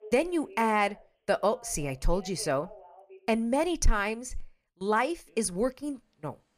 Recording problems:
alarms or sirens; faint; throughout; 20 dB below the speech

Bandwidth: 15 kHz